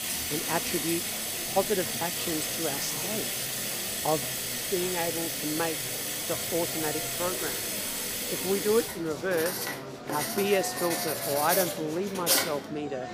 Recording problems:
household noises; very loud; throughout; 2 dB above the speech
murmuring crowd; loud; throughout; 9 dB below the speech

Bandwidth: 15 kHz